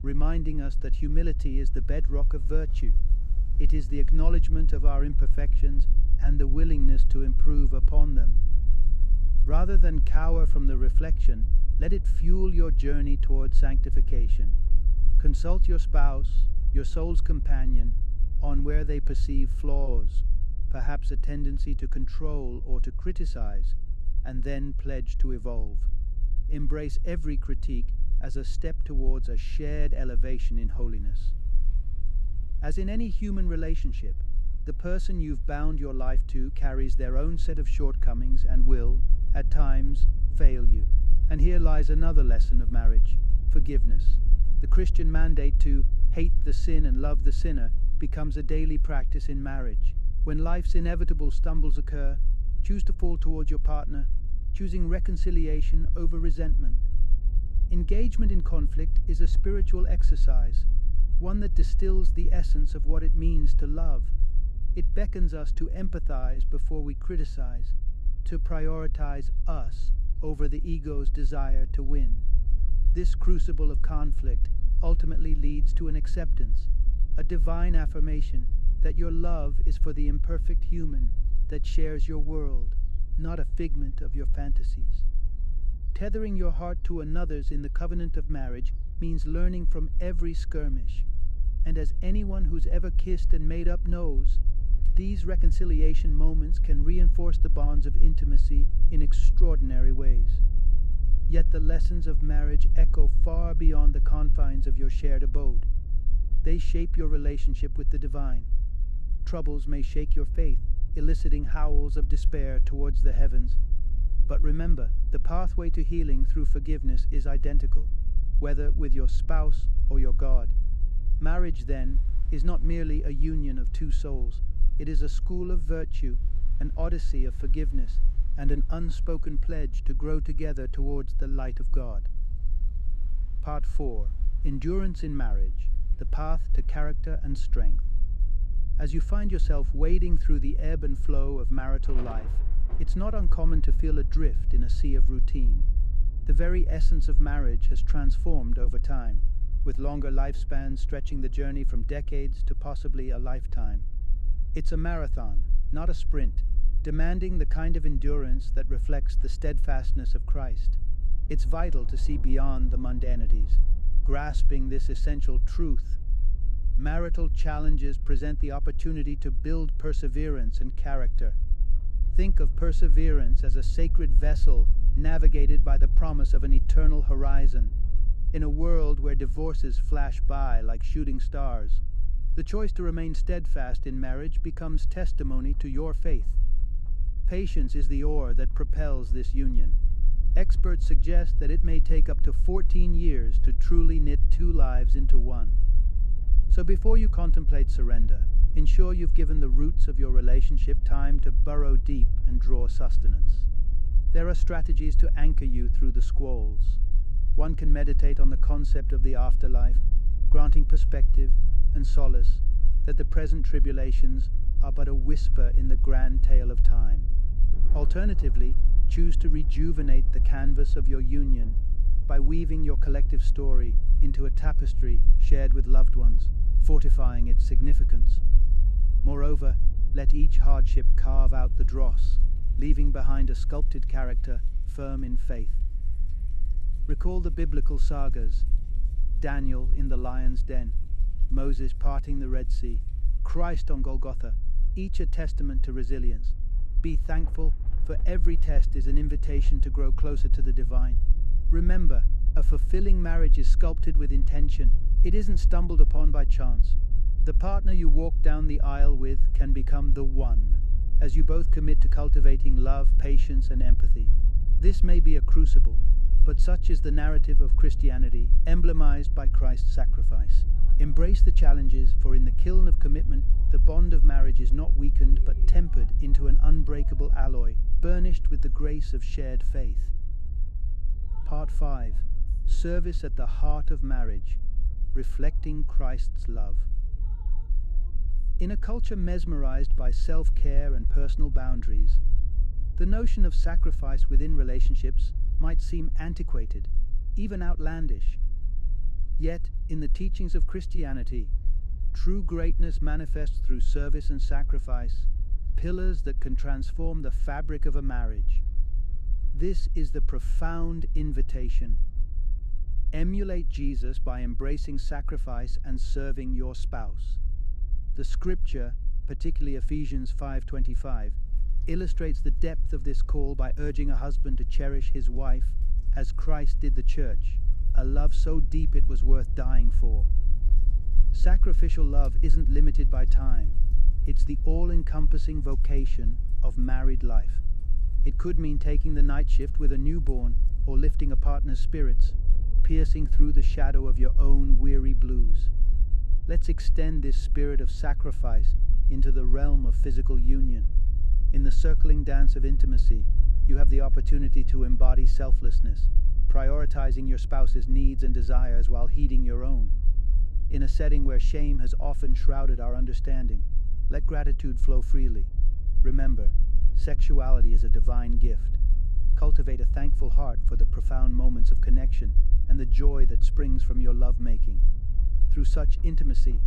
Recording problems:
low rumble; noticeable; throughout; 15 dB below the speech
rain or running water; faint; throughout; 25 dB below the speech

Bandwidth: 14.5 kHz